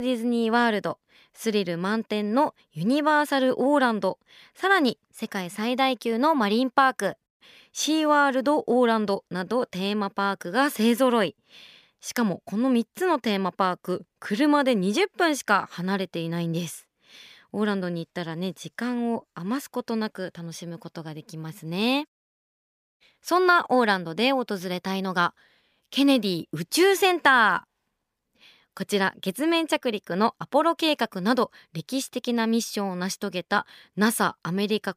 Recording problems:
abrupt cut into speech; at the start

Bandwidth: 15 kHz